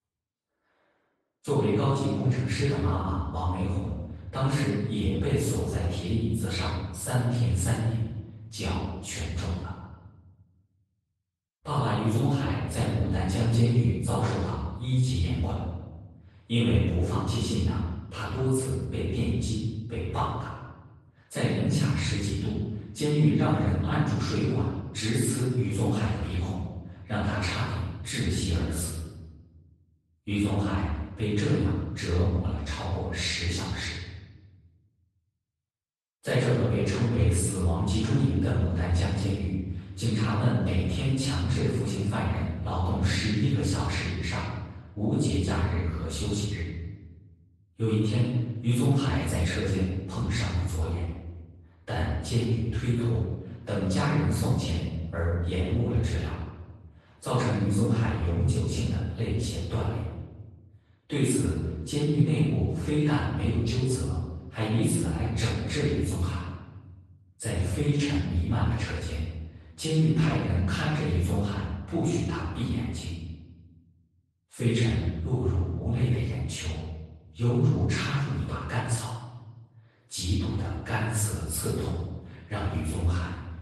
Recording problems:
room echo; strong; dies away in 1.1 s
off-mic speech; far
garbled, watery; slightly; nothing above 10 kHz

